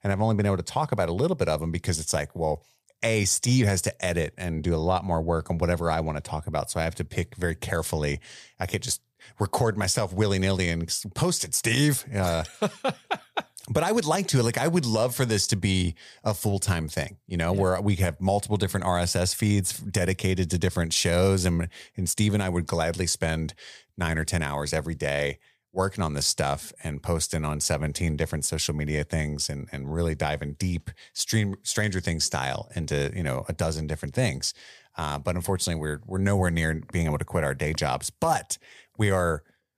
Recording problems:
none

